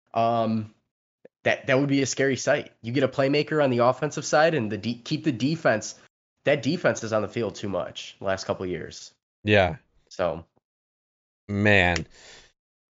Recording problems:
high frequencies cut off; noticeable; nothing above 7.5 kHz

